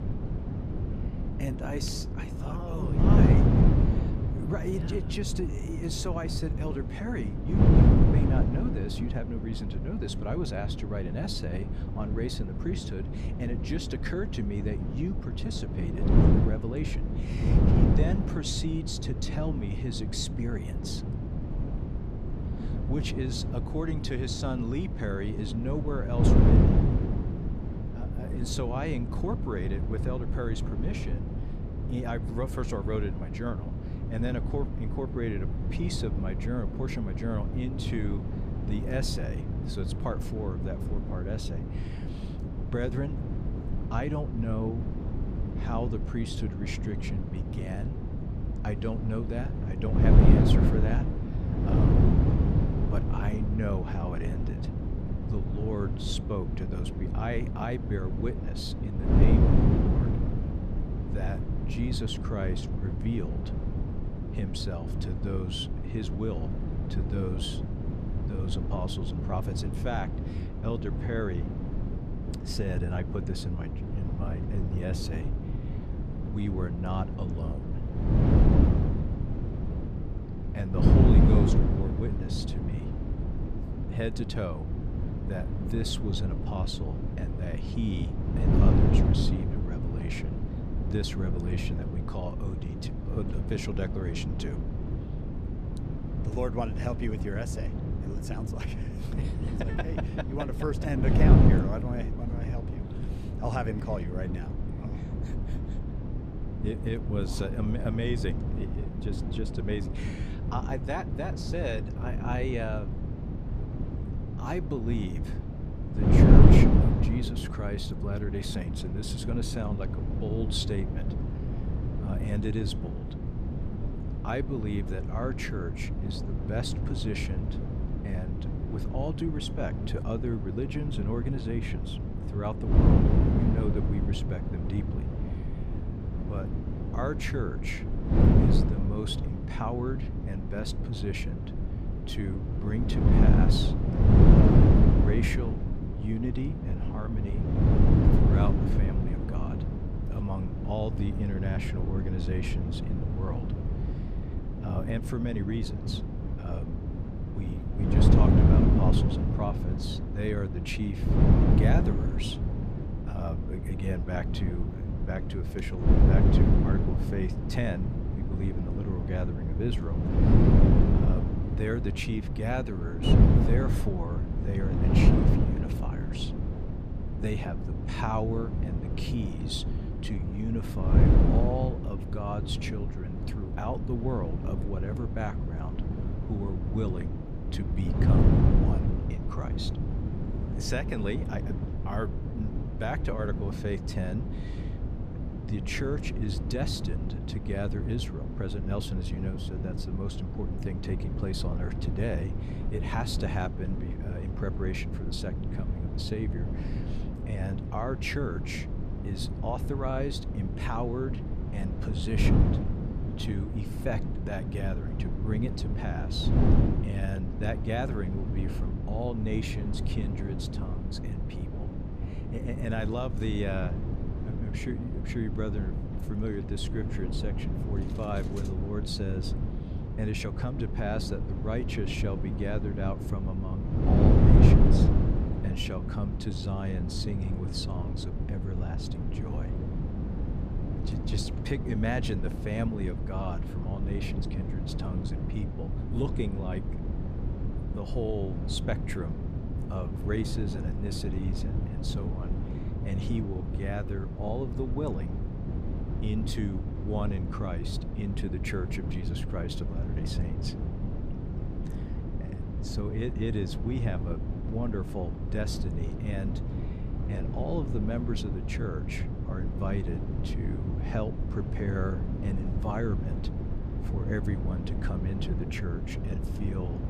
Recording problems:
wind noise on the microphone; heavy; 1 dB below the speech

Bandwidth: 14.5 kHz